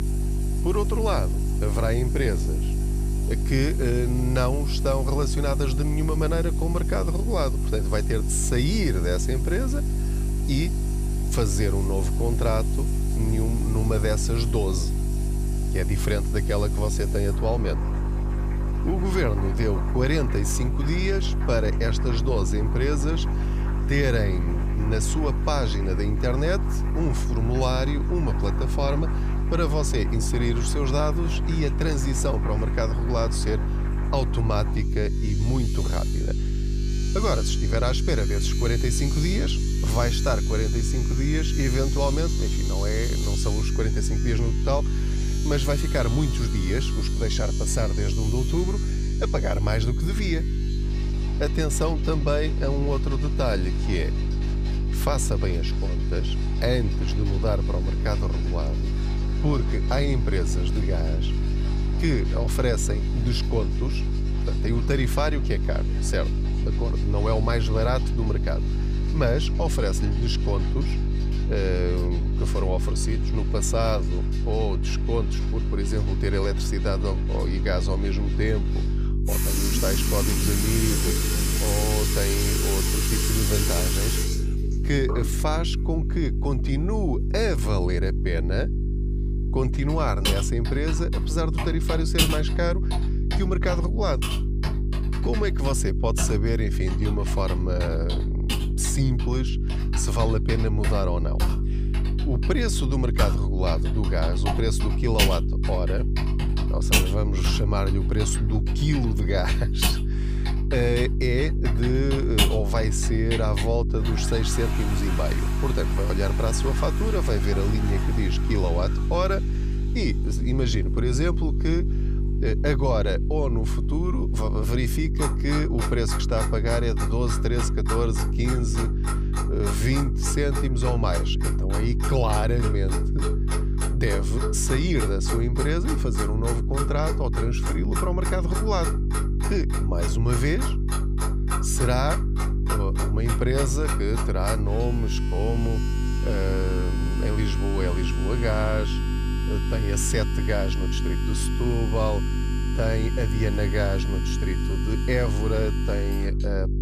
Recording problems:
electrical hum; loud; throughout; 50 Hz, 9 dB below the speech
household noises; loud; throughout; 7 dB below the speech

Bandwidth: 15 kHz